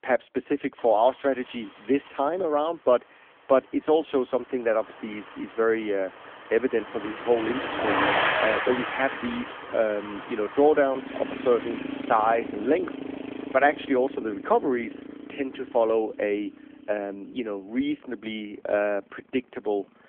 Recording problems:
phone-call audio; nothing above 3.5 kHz
traffic noise; loud; throughout; 5 dB below the speech

